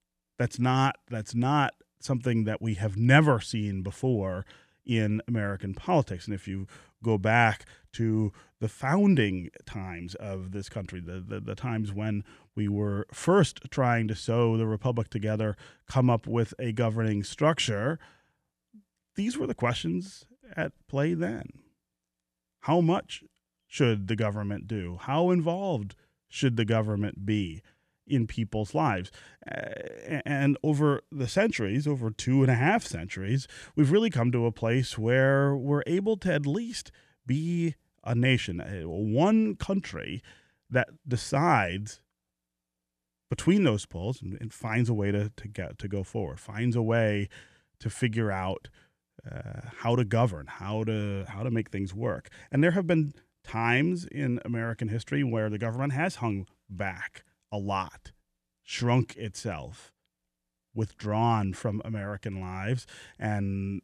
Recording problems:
none

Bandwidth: 14.5 kHz